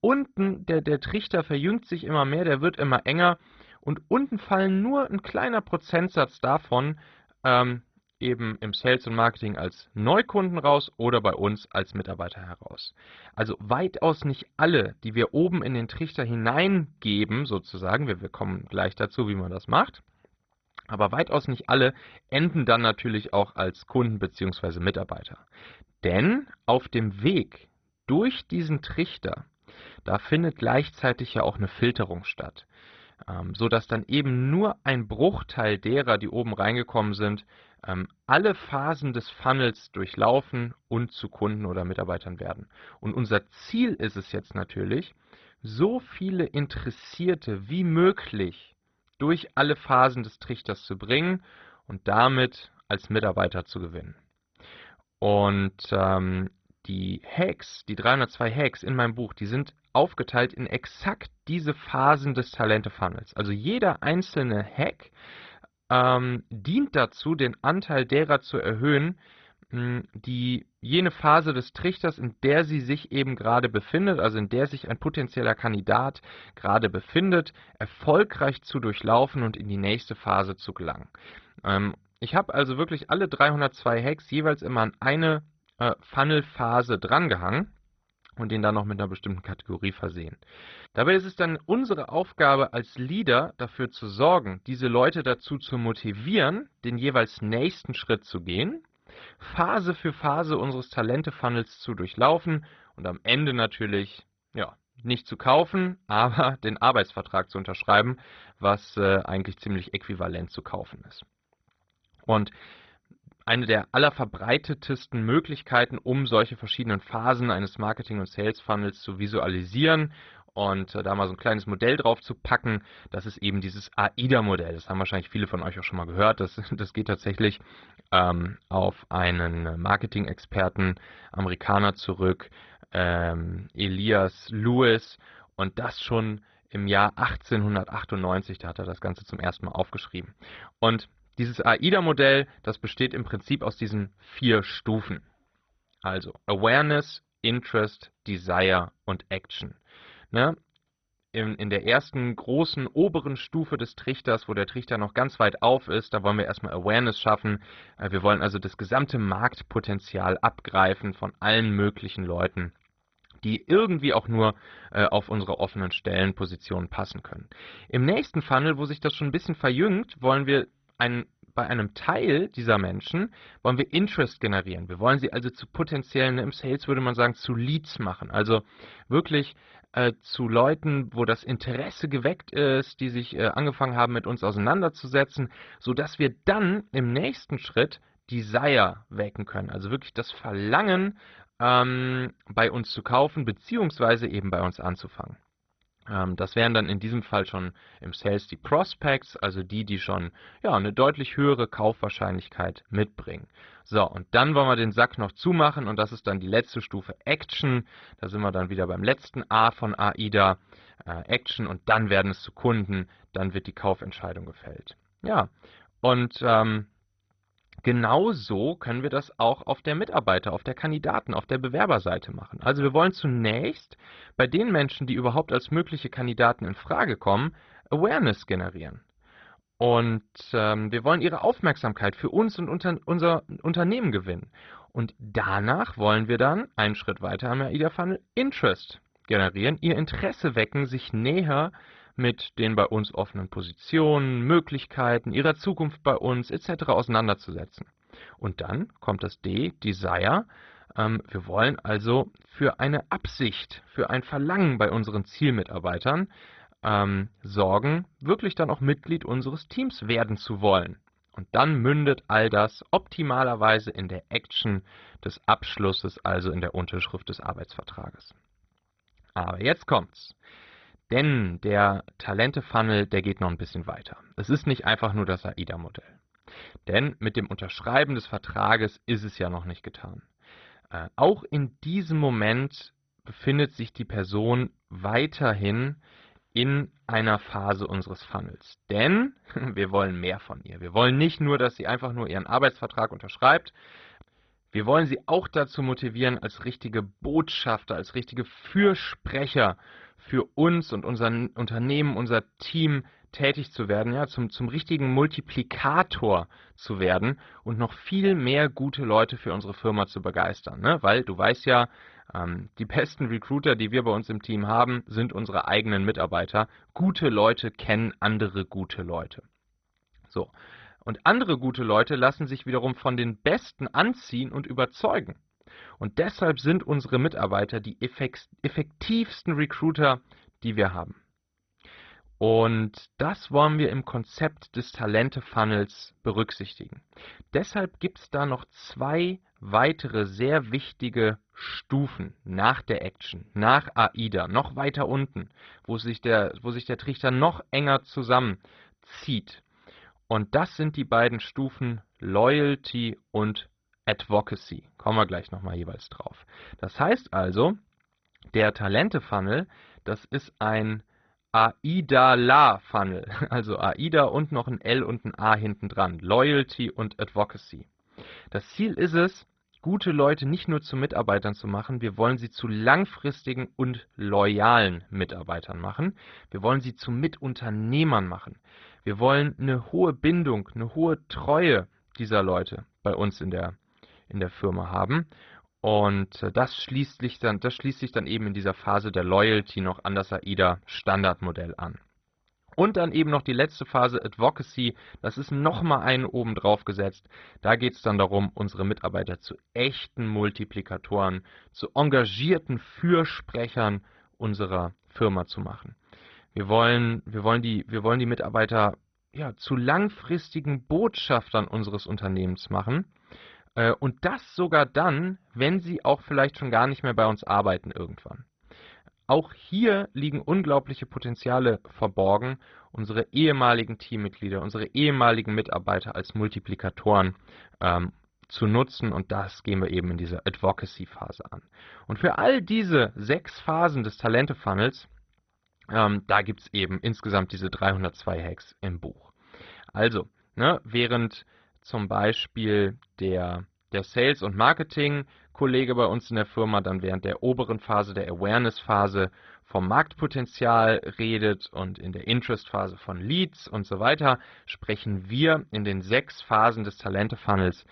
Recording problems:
garbled, watery; badly; nothing above 6 kHz
muffled; very slightly; fading above 3.5 kHz

